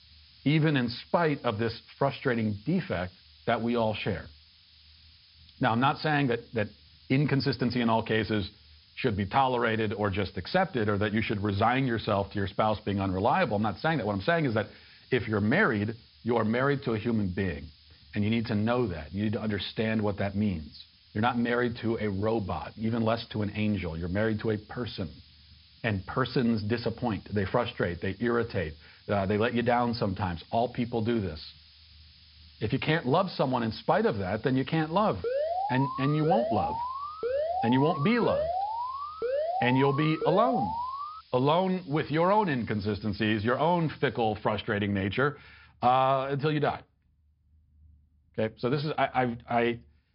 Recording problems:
high frequencies cut off; noticeable; nothing above 5.5 kHz
hiss; faint; until 44 s; 25 dB below the speech
alarm; noticeable; from 35 to 41 s; peak 1 dB below the speech

